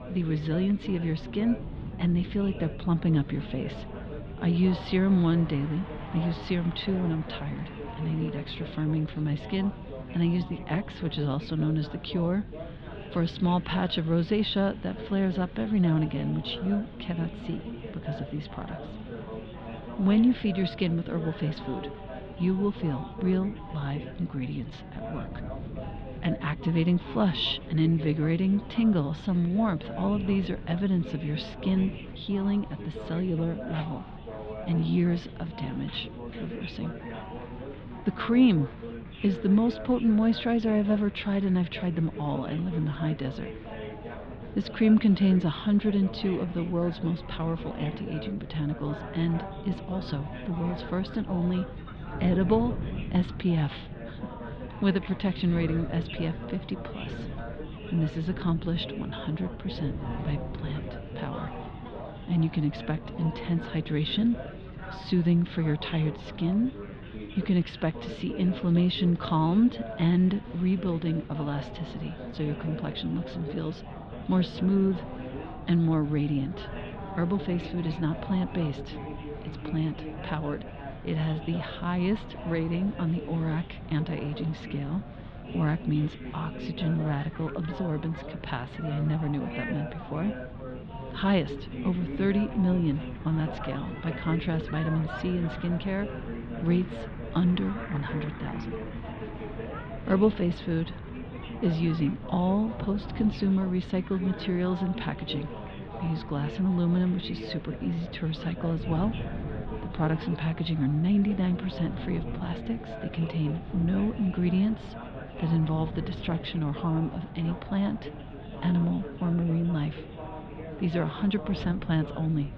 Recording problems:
muffled; very; fading above 3.5 kHz
chatter from many people; noticeable; throughout; 15 dB below the speech
wind noise on the microphone; occasional gusts; 15 dB below the speech

